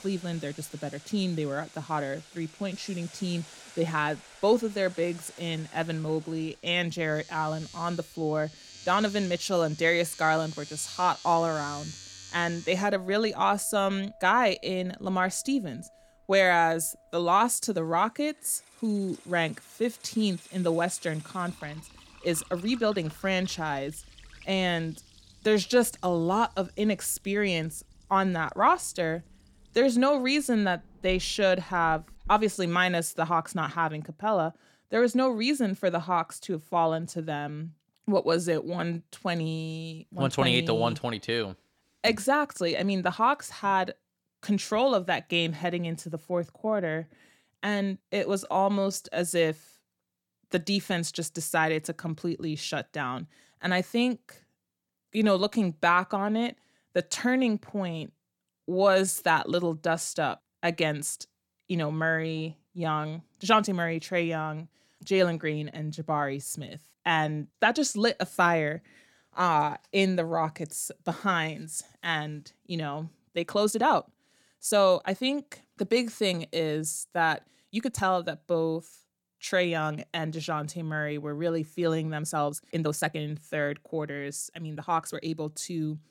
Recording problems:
household noises; noticeable; until 32 s; 20 dB below the speech
uneven, jittery; strongly; from 22 s to 1:25

